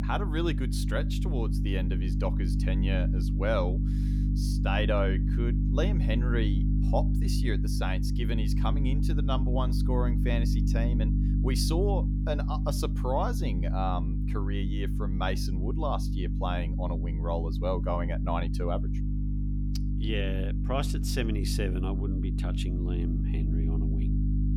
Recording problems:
electrical hum; loud; throughout; 50 Hz, 6 dB below the speech

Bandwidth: 18 kHz